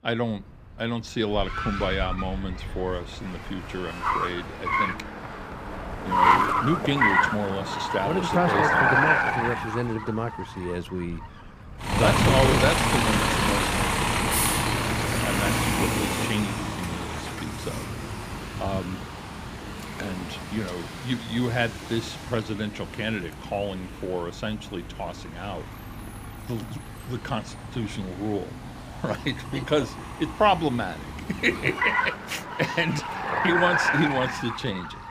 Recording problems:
traffic noise; very loud; throughout; 3 dB above the speech

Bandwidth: 15.5 kHz